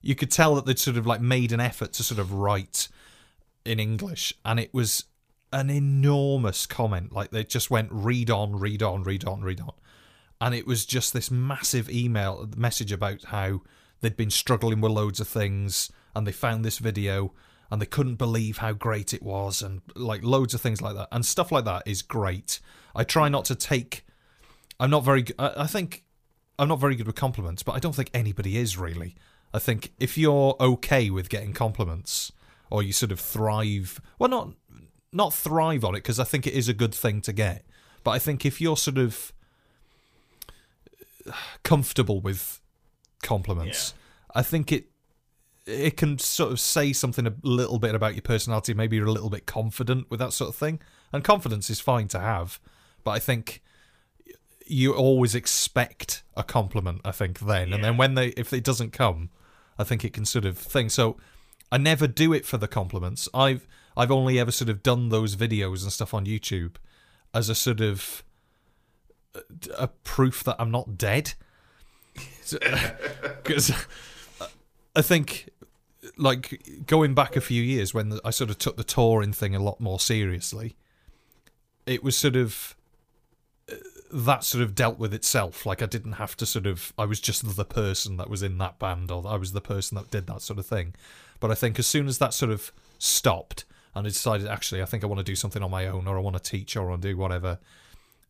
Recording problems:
none

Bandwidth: 15 kHz